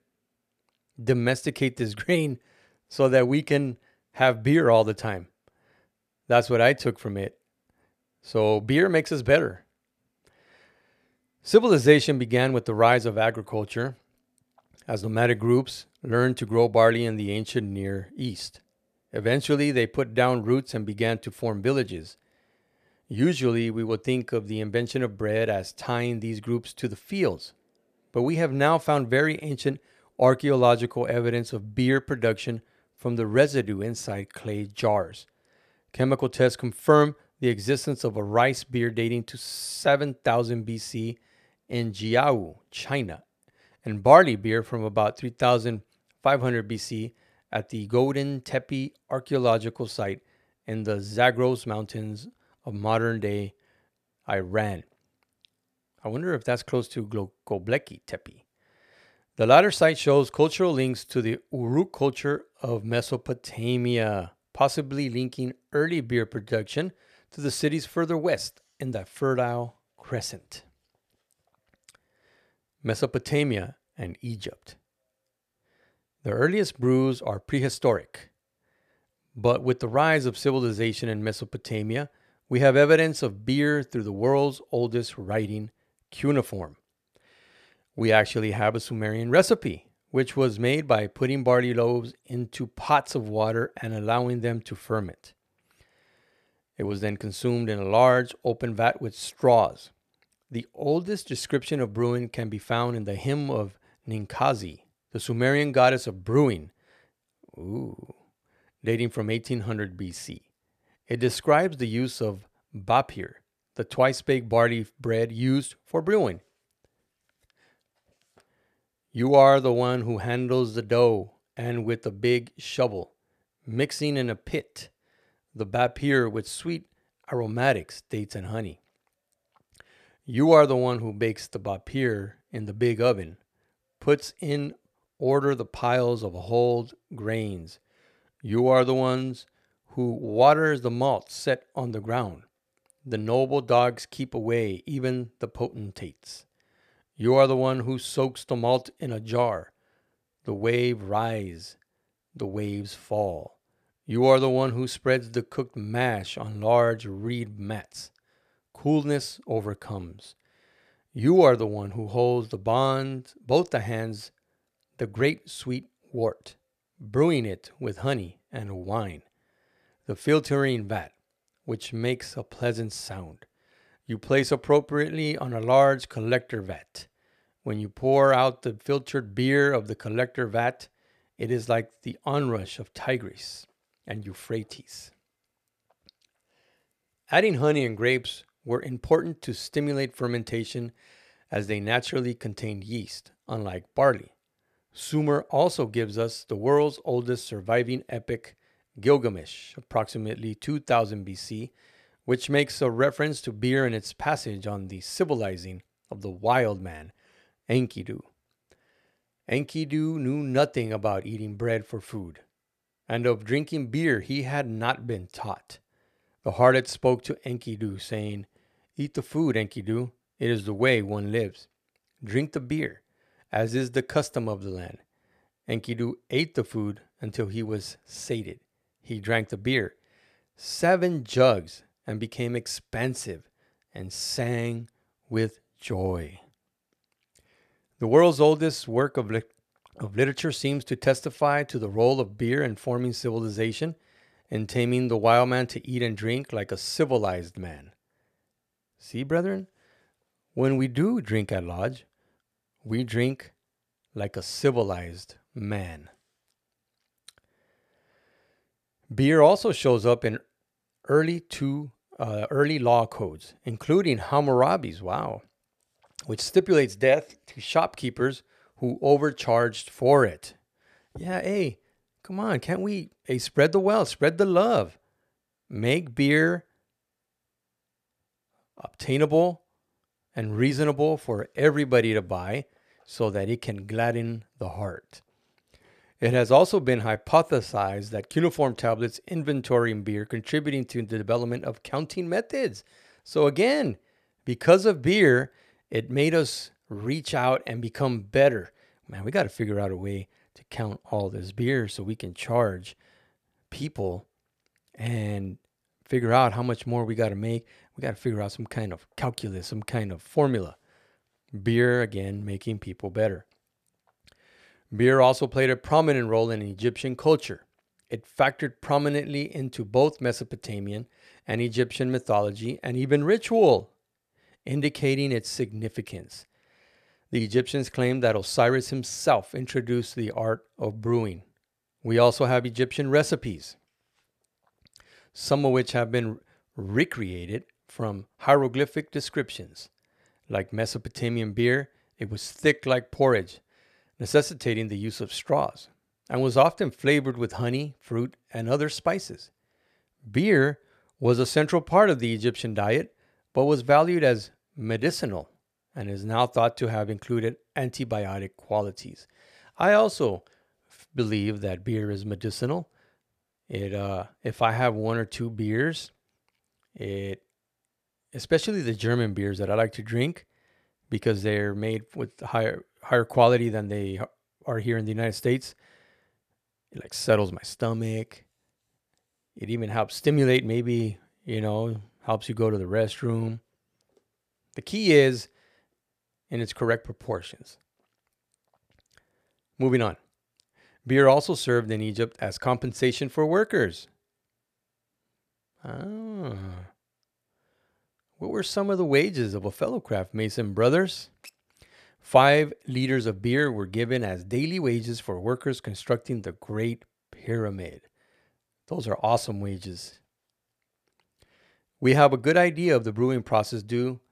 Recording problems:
none

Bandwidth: 14.5 kHz